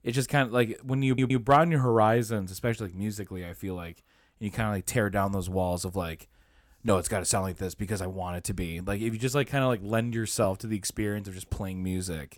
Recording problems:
audio stuttering; at 1 s

